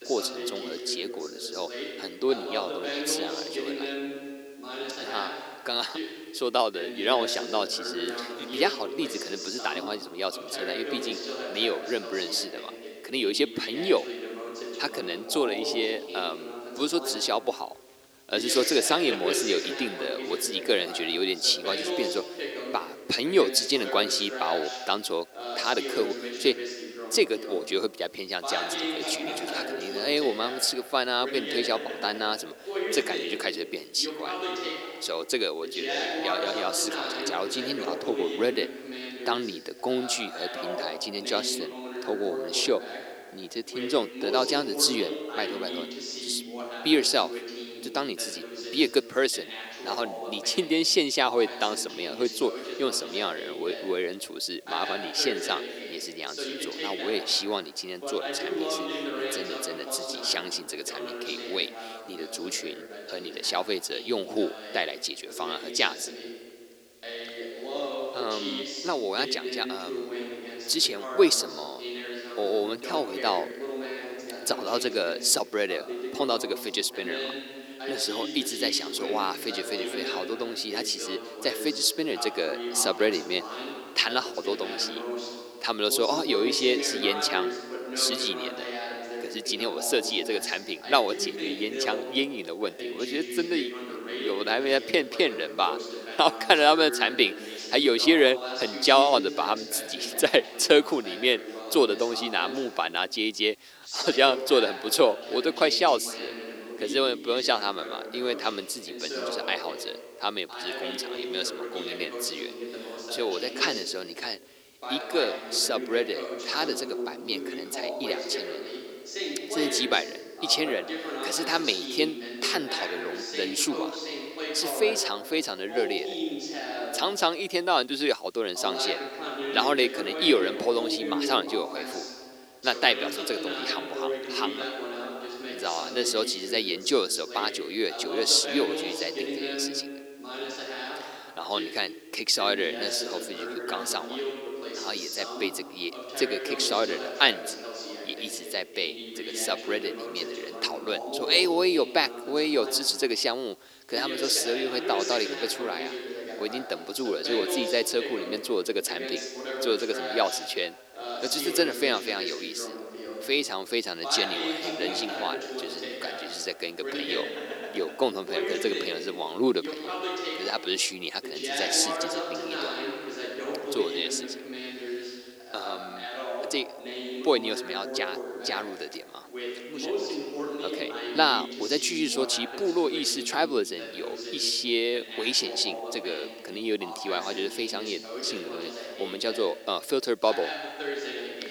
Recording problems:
thin; somewhat; fading below 300 Hz
voice in the background; loud; throughout; 8 dB below the speech
hiss; faint; throughout; 30 dB below the speech

